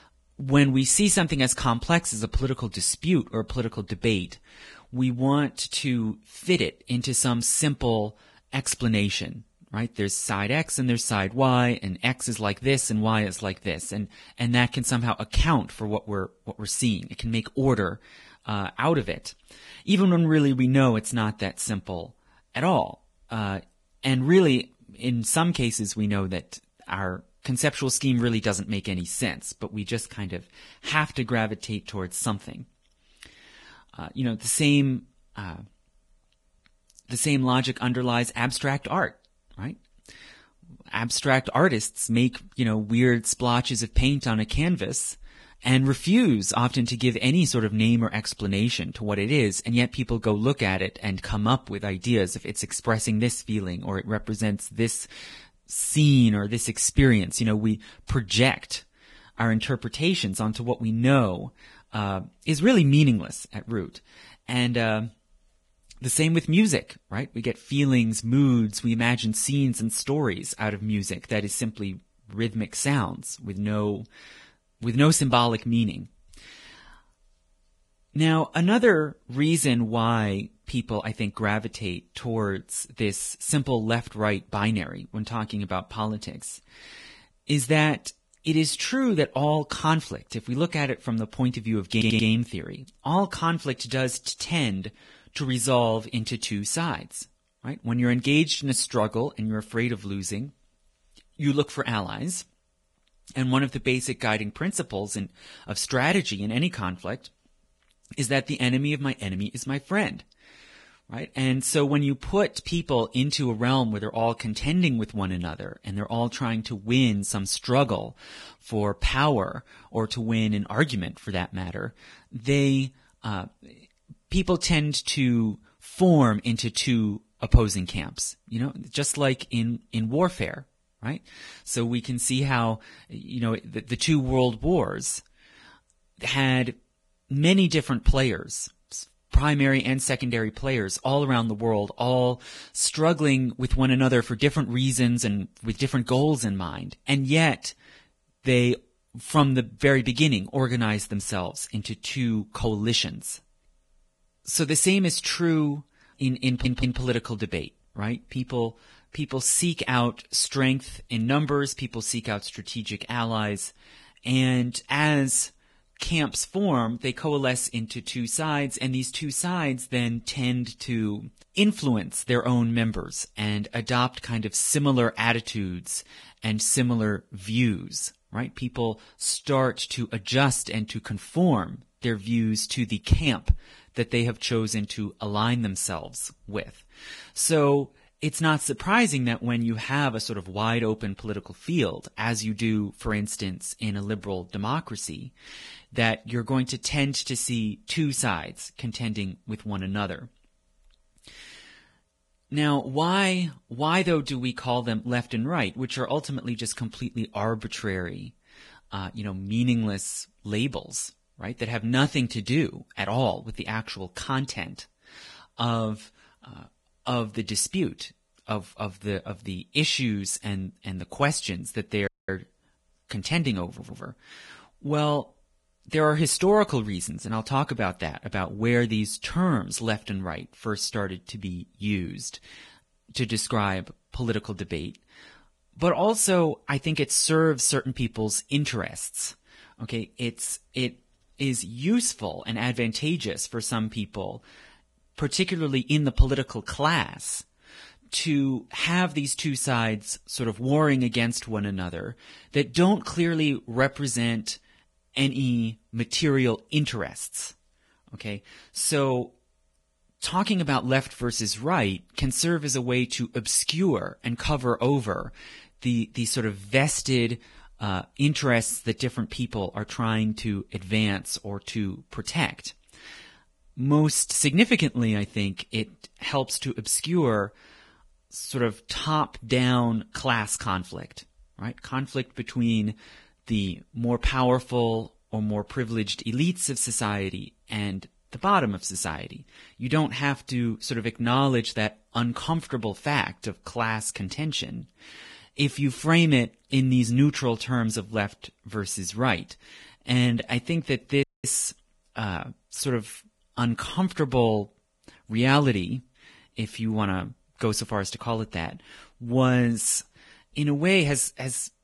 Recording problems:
garbled, watery; badly; nothing above 11 kHz
audio stuttering; at 1:32, at 2:36 and at 3:44
audio cutting out; at 3:42 and at 5:01

